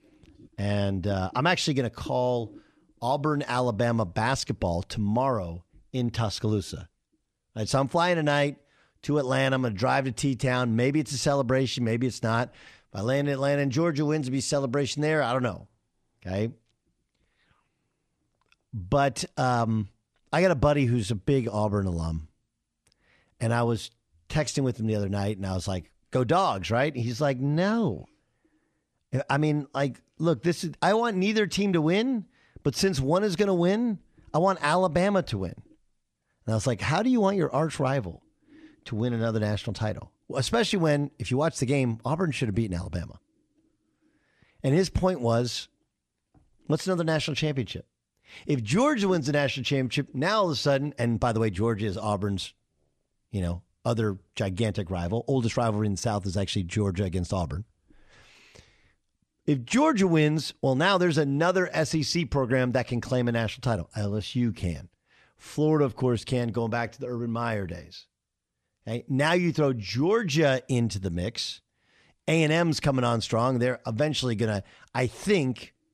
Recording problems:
none

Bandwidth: 13.5 kHz